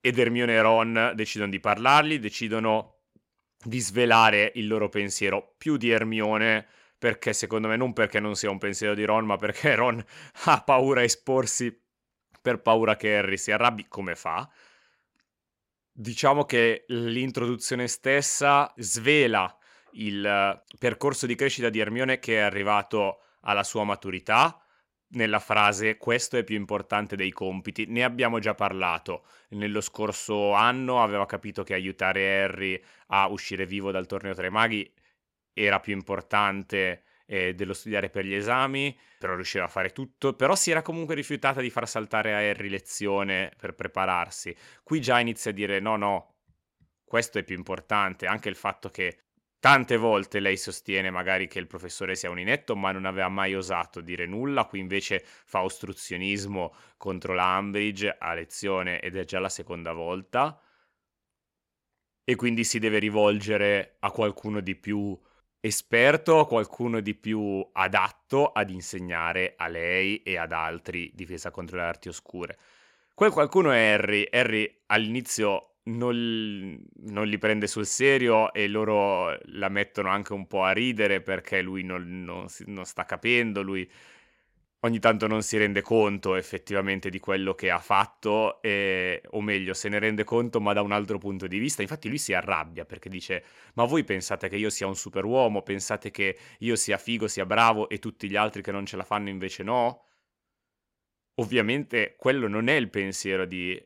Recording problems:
none

